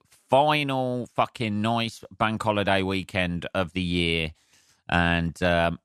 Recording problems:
none

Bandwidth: 13.5 kHz